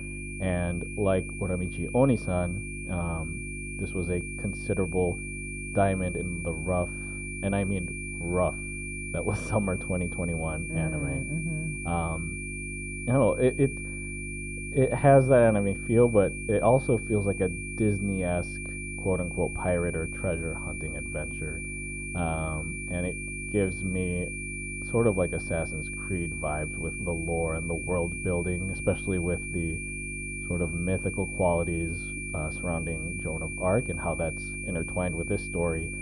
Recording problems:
muffled; very; fading above 2 kHz
high-pitched whine; loud; throughout; 2.5 kHz, 7 dB below the speech
electrical hum; noticeable; throughout; 50 Hz, 15 dB below the speech

